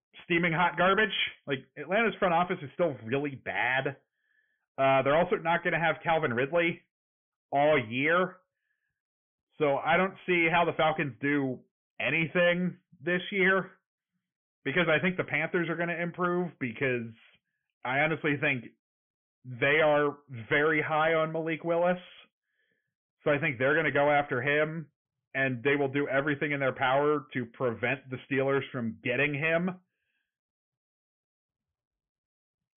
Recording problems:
high frequencies cut off; severe; nothing above 3.5 kHz
distortion; slight; 4% of the sound clipped

